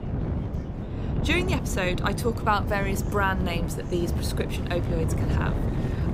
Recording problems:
wind noise on the microphone; heavy; 8 dB below the speech
murmuring crowd; noticeable; throughout; 20 dB below the speech

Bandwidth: 15.5 kHz